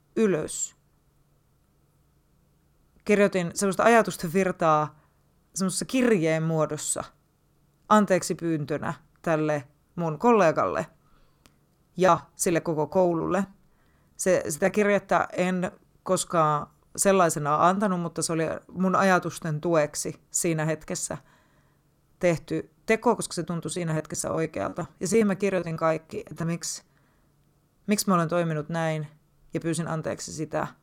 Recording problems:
choppy; very; from 12 to 15 s and from 23 to 27 s; 16% of the speech affected

